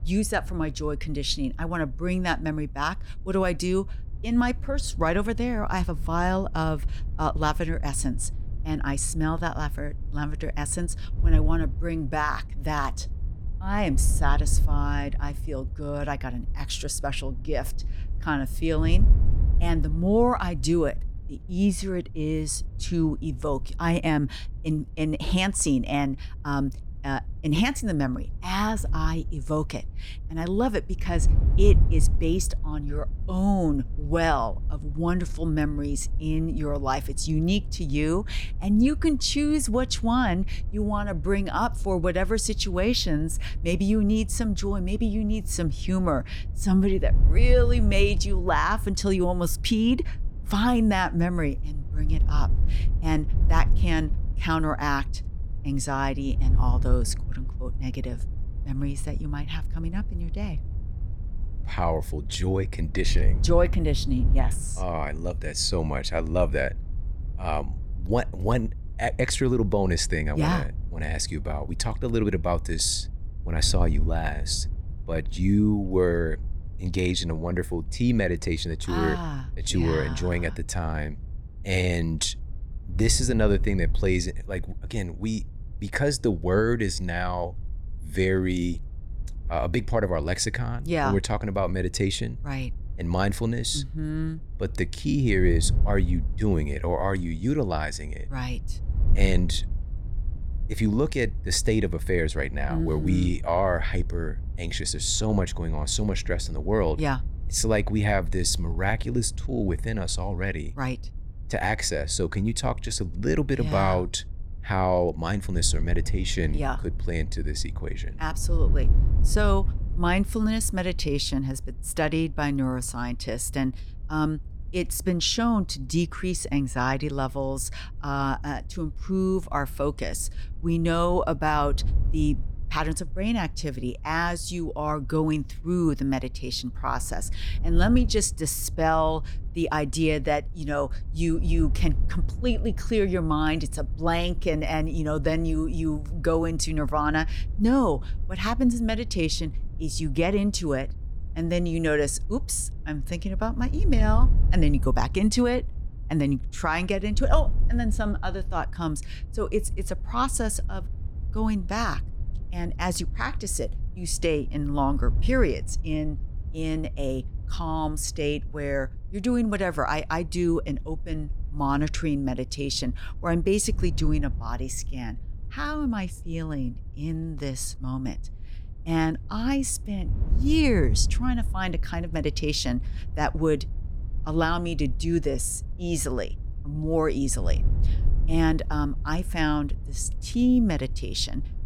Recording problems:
wind noise on the microphone; occasional gusts; 20 dB below the speech

